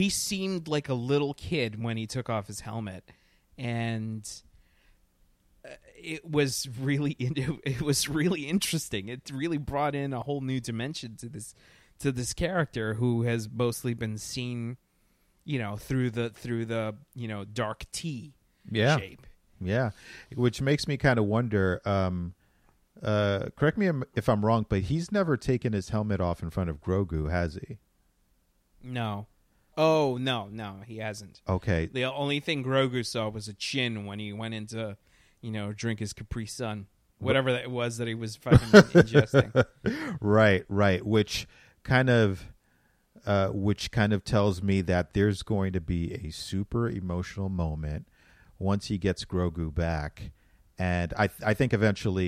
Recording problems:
abrupt cut into speech; at the start and the end

